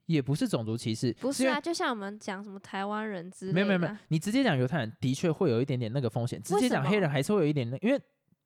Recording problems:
none

